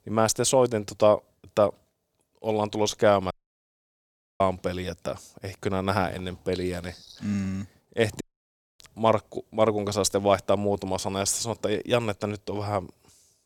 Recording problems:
audio cutting out; at 3.5 s for 1 s and at 8 s for 0.5 s

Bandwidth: 18.5 kHz